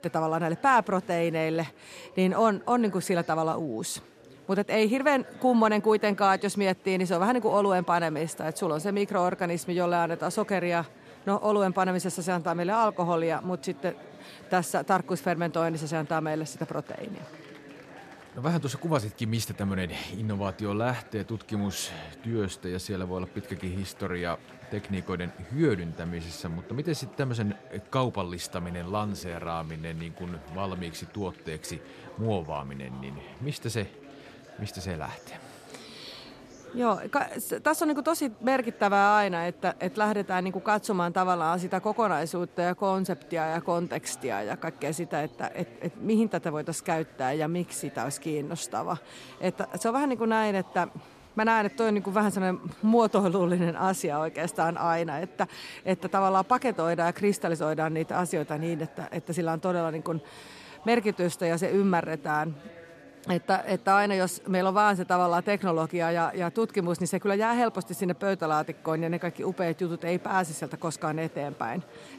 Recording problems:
murmuring crowd; faint; throughout; 20 dB below the speech

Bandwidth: 14 kHz